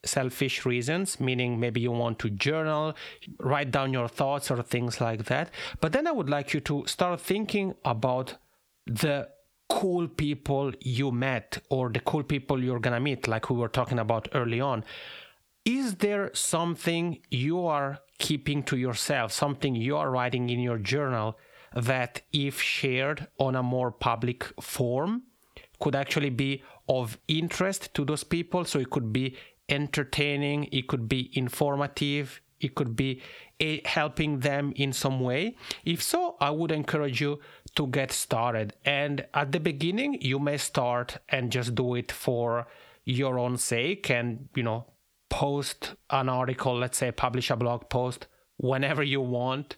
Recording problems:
squashed, flat; heavily

